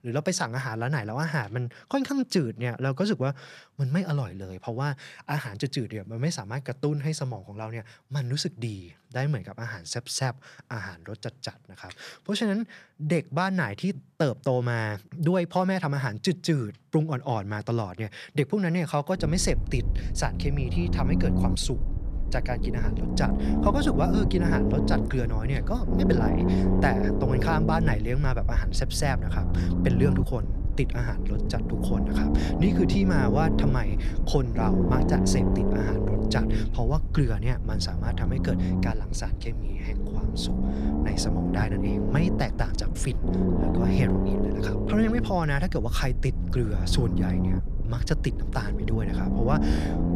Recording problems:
low rumble; loud; from 19 s on; 2 dB below the speech

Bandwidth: 14.5 kHz